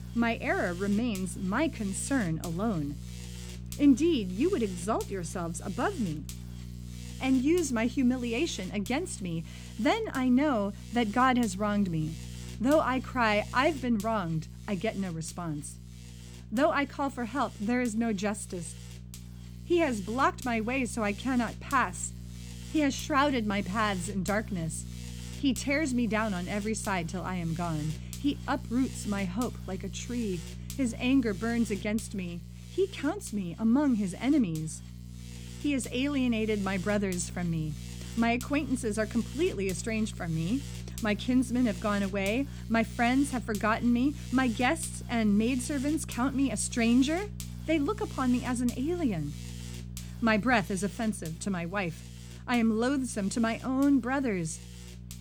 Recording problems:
electrical hum; noticeable; throughout; 60 Hz, 20 dB below the speech

